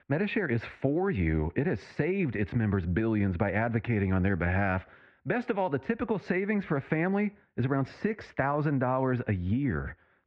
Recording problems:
muffled; very; fading above 2.5 kHz

